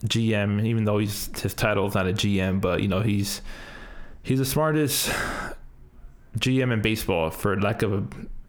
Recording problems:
squashed, flat; heavily

